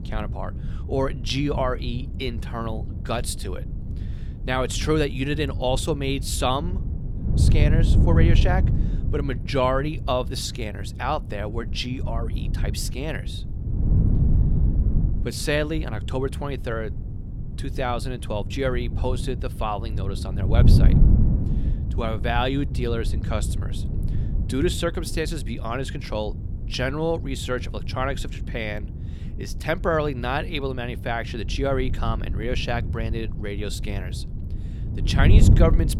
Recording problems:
wind noise on the microphone; occasional gusts; 10 dB below the speech

